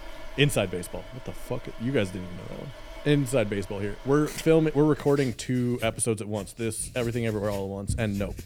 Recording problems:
household noises; noticeable; throughout; 15 dB below the speech

